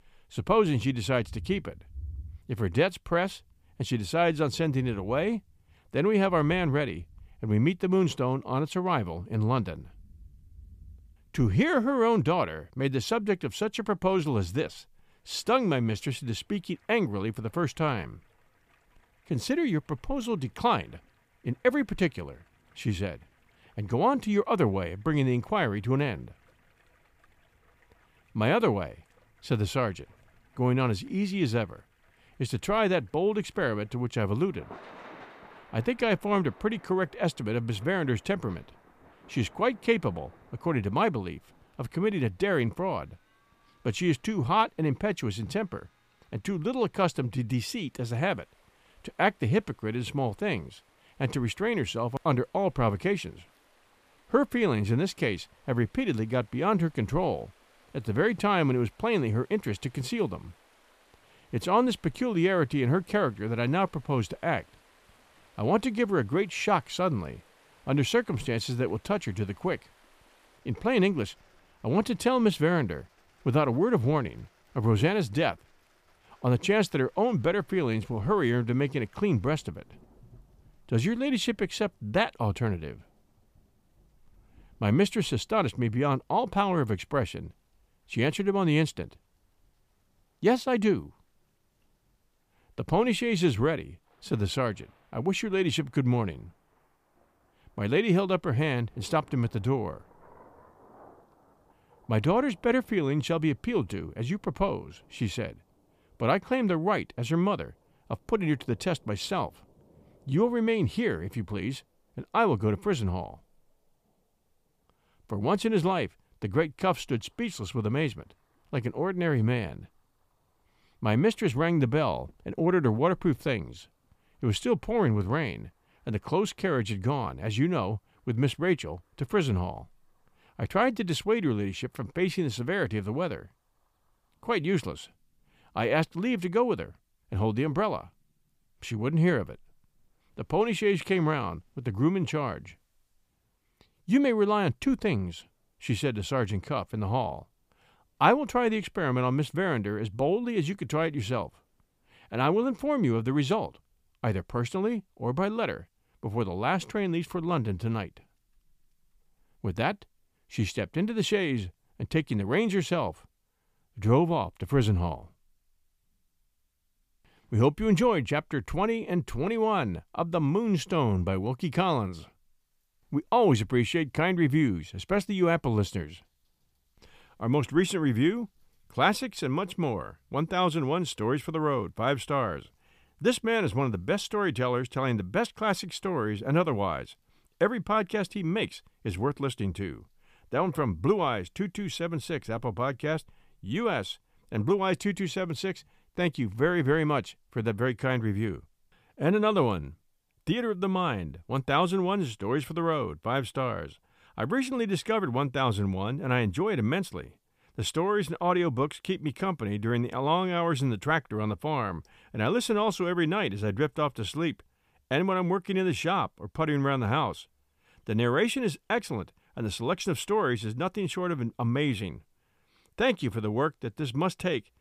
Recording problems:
rain or running water; faint; throughout; 30 dB below the speech

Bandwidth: 15 kHz